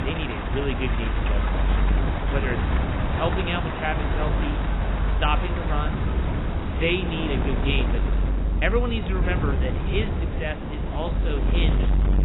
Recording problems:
garbled, watery; badly; nothing above 4 kHz
wind noise on the microphone; heavy; 6 dB below the speech
rain or running water; loud; throughout; 5 dB below the speech

